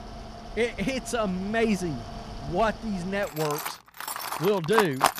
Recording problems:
machinery noise; loud; throughout; 7 dB below the speech

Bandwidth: 14.5 kHz